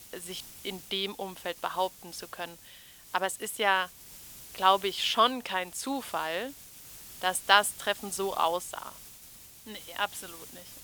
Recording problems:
thin; very; fading below 600 Hz
hiss; noticeable; throughout; 15 dB below the speech

